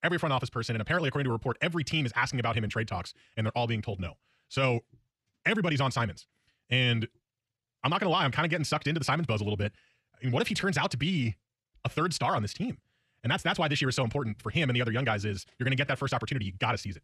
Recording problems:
wrong speed, natural pitch; too fast; 1.6 times normal speed

